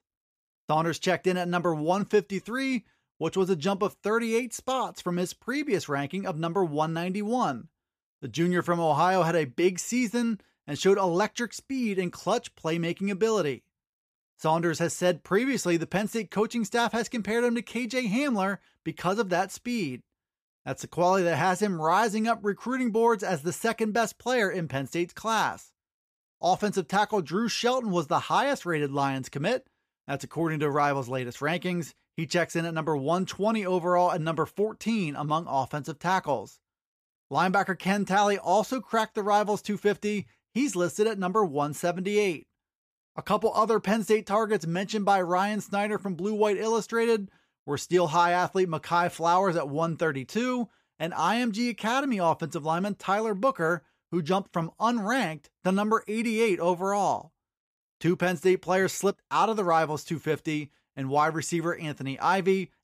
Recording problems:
none

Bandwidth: 14.5 kHz